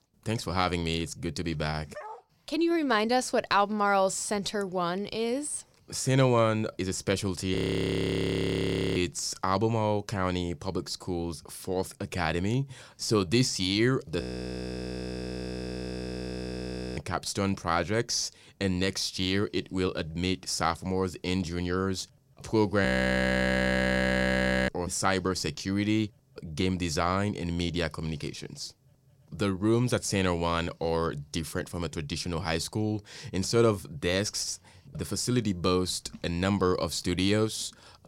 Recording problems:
dog barking; faint; at 2 s; peak 15 dB below the speech
audio freezing; at 7.5 s for 1.5 s, at 14 s for 3 s and at 23 s for 2 s

